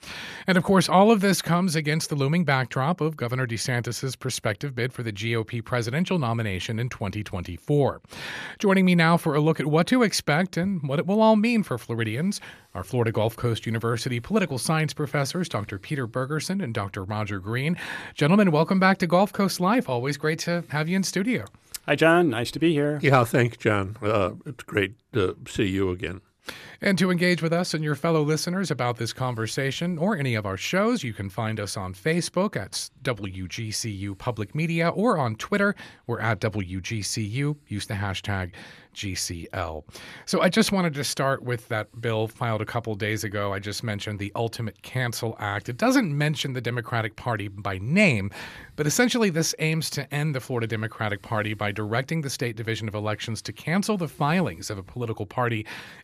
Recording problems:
none

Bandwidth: 14.5 kHz